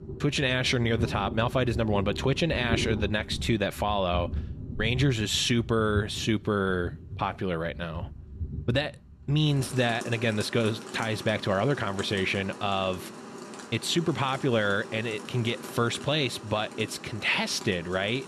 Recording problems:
rain or running water; noticeable; throughout; 10 dB below the speech

